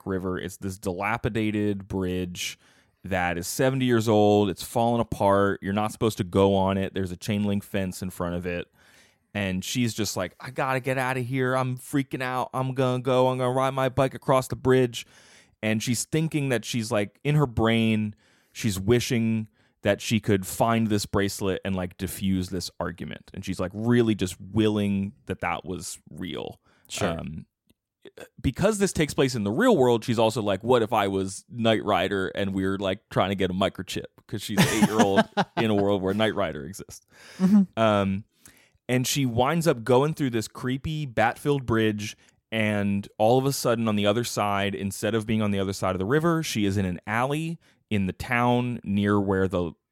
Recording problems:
none

